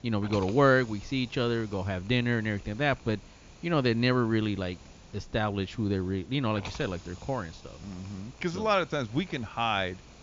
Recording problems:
high frequencies cut off; noticeable; nothing above 7 kHz
hiss; faint; throughout; 20 dB below the speech

